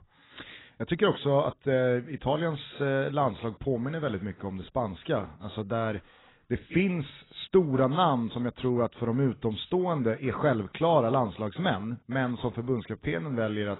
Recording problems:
garbled, watery; badly; nothing above 4 kHz

